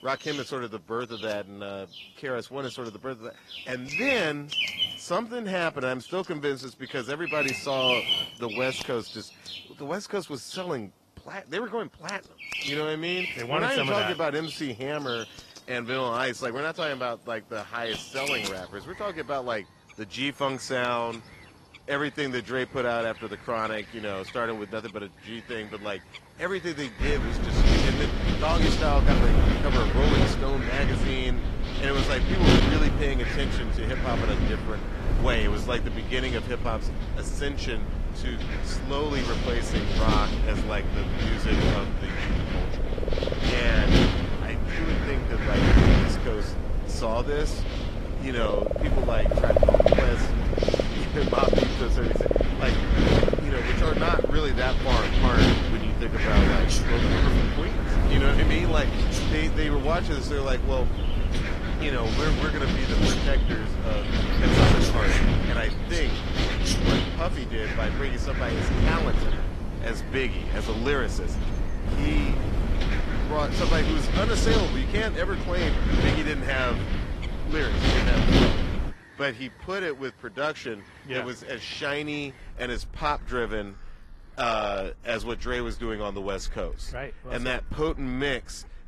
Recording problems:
garbled, watery; slightly; nothing above 13.5 kHz
wind noise on the microphone; heavy; from 27 s to 1:19; as loud as the speech
animal sounds; loud; throughout; 1 dB below the speech

